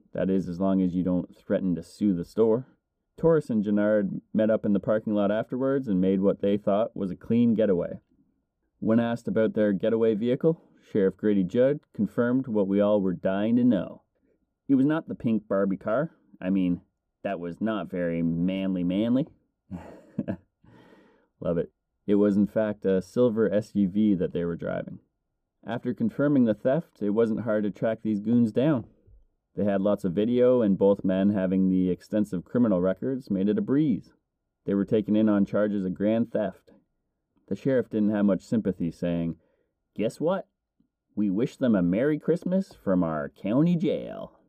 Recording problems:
muffled; very; fading above 1 kHz

